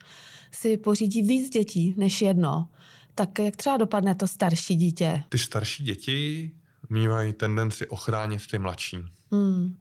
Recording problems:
garbled, watery; slightly; nothing above 19 kHz

